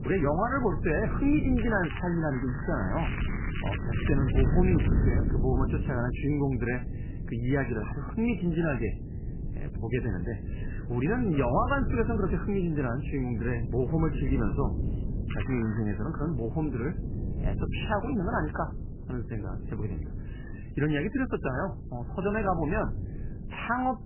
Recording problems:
garbled, watery; badly; nothing above 3 kHz
crackling; loud; from 1.5 to 5 s and at 15 s; 10 dB below the speech
wind noise on the microphone; occasional gusts; 10 dB below the speech

